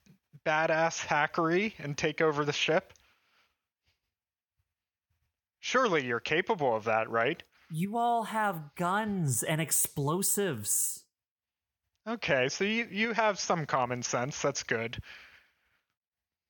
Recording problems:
none

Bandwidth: 17.5 kHz